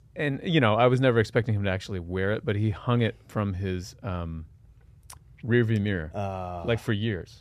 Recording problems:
none

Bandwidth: 14.5 kHz